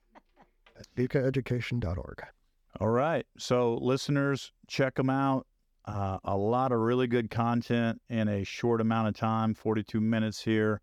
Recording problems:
none

